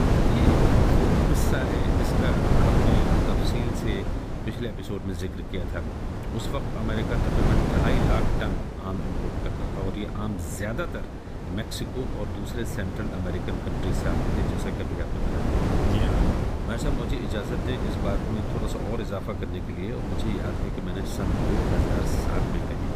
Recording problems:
wind noise on the microphone; heavy; 4 dB above the speech

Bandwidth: 15 kHz